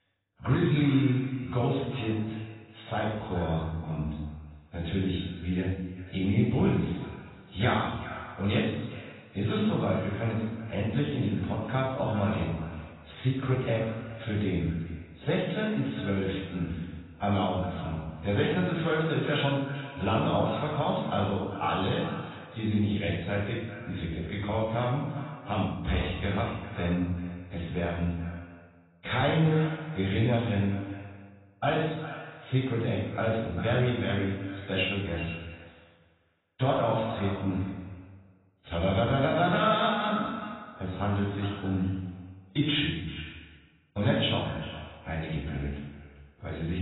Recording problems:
off-mic speech; far
garbled, watery; badly; nothing above 4 kHz
echo of what is said; noticeable; throughout; 390 ms later, 15 dB below the speech
room echo; noticeable; dies away in 0.9 s
abrupt cut into speech; at the end

